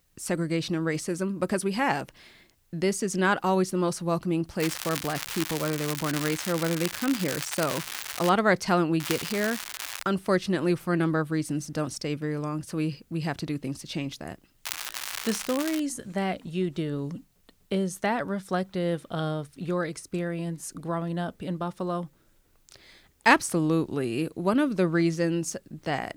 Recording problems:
crackling; loud; from 4.5 to 8.5 s, from 9 to 10 s and from 15 to 16 s; 6 dB below the speech

